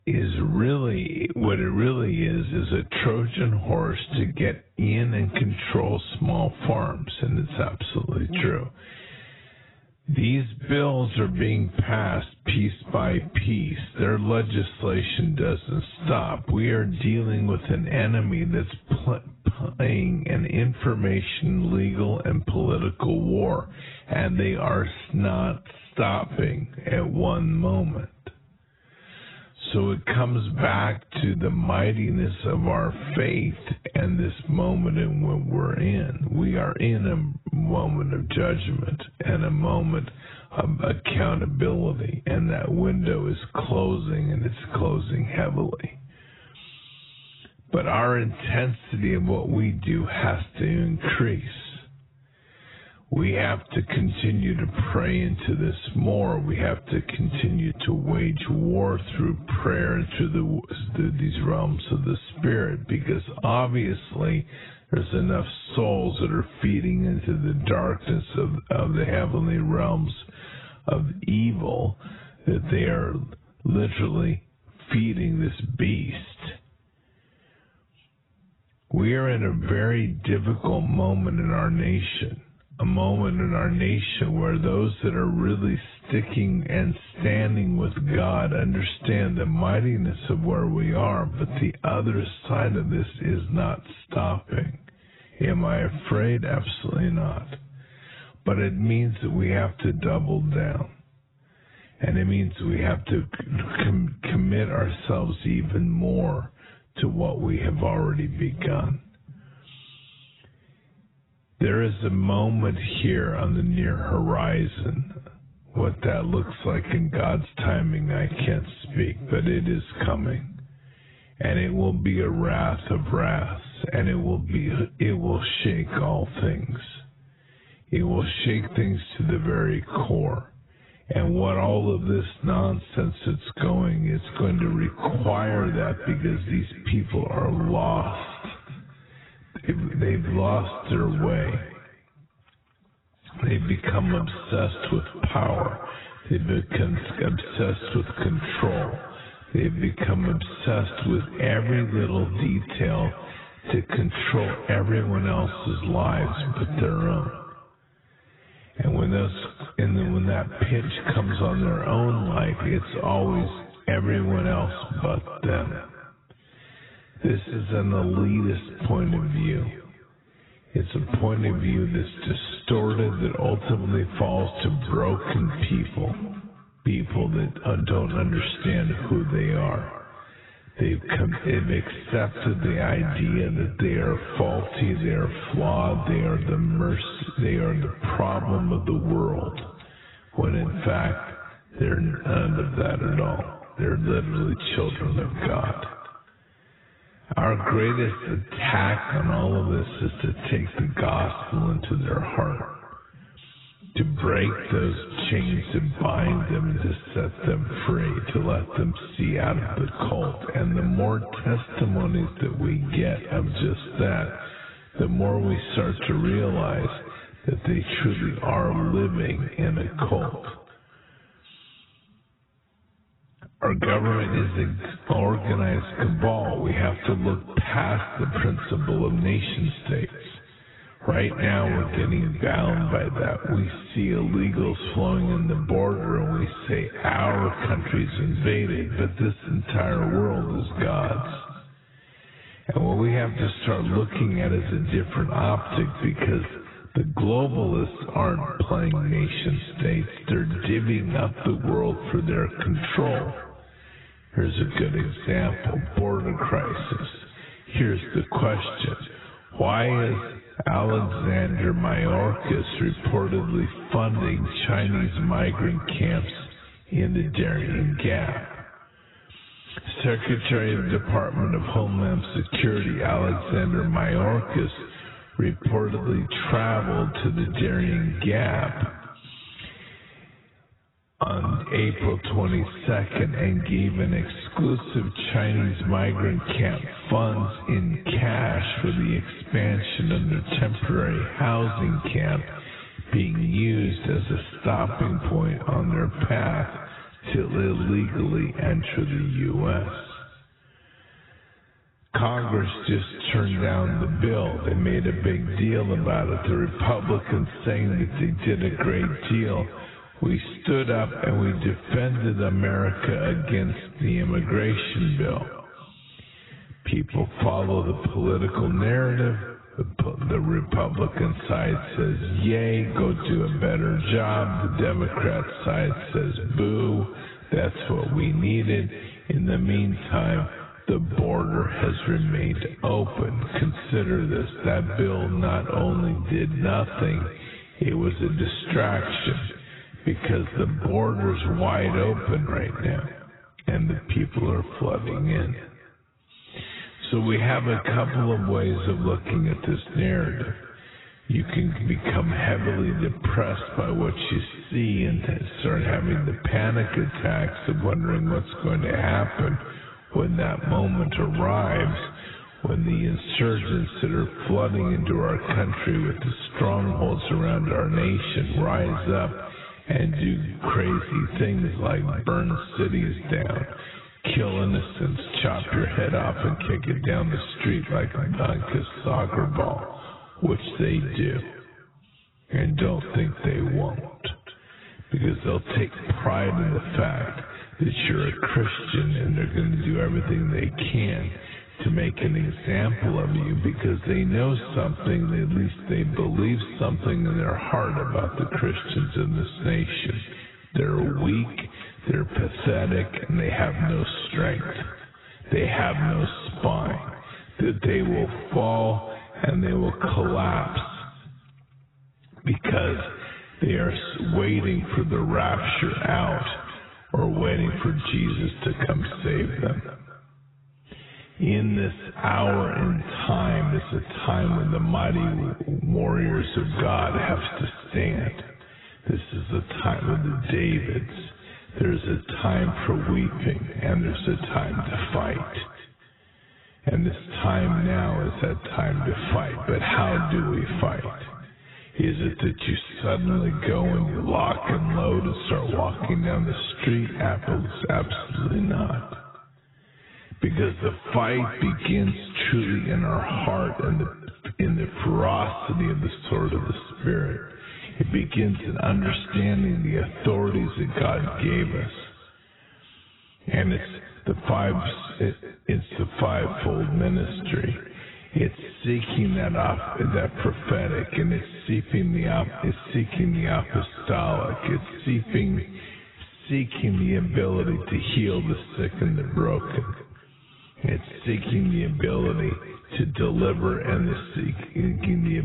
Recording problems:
garbled, watery; badly; nothing above 4 kHz
wrong speed, natural pitch; too slow; 0.6 times normal speed
echo of what is said; noticeable; from 2:14 on; 220 ms later, 15 dB below the speech
squashed, flat; somewhat
abrupt cut into speech; at the end

